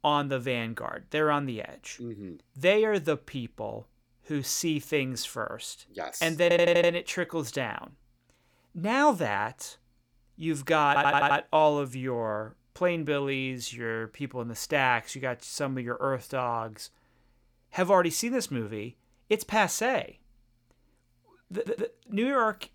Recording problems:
audio stuttering; at 6.5 s, at 11 s and at 22 s

